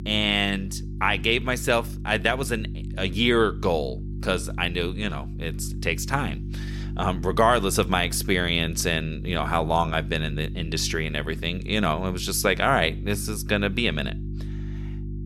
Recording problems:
electrical hum; noticeable; throughout; 50 Hz, 20 dB below the speech

